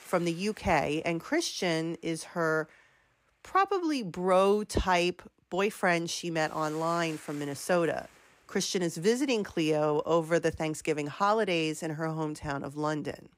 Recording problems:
hiss; faint; throughout; 25 dB below the speech

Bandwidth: 15.5 kHz